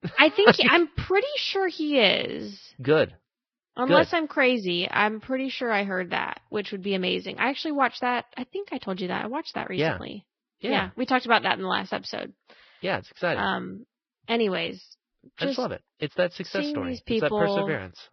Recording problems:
garbled, watery; badly; nothing above 5.5 kHz

